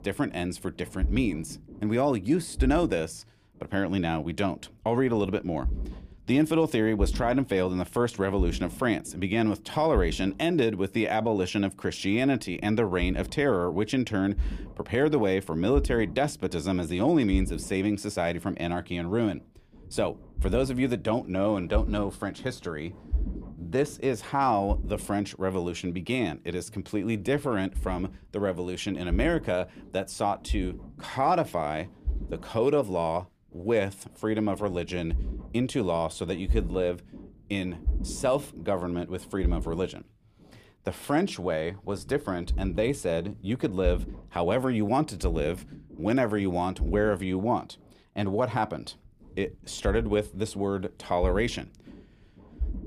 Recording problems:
low rumble; faint; throughout; 20 dB below the speech

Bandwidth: 15 kHz